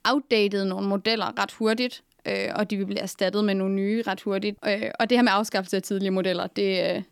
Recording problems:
none

